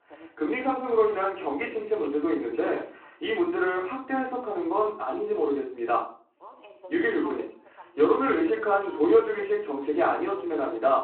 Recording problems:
off-mic speech; far
room echo; slight; dies away in 0.4 s
phone-call audio
voice in the background; faint; throughout; 20 dB below the speech

